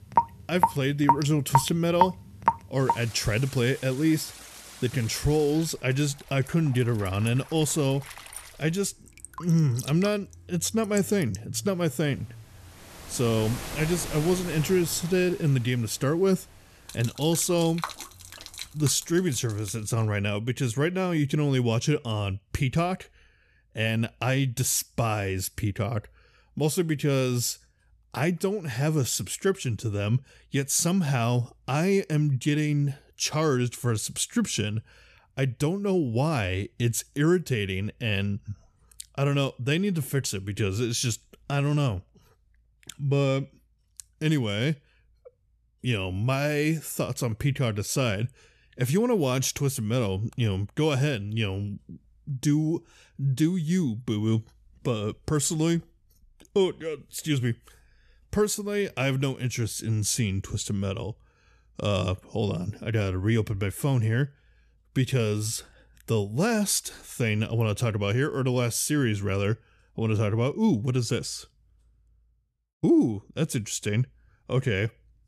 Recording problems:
rain or running water; loud; until 20 s; 6 dB below the speech

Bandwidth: 13.5 kHz